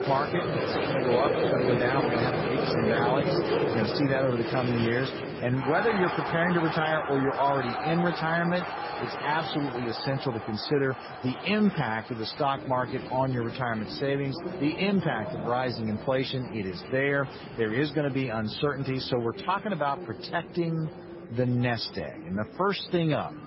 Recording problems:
garbled, watery; badly; nothing above 5.5 kHz
crowd noise; loud; throughout; 3 dB below the speech

